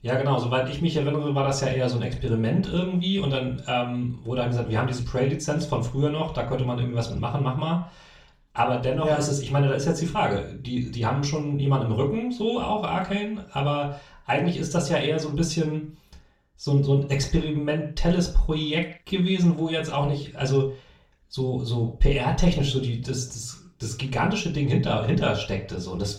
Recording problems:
off-mic speech; far
room echo; slight; dies away in 0.4 s

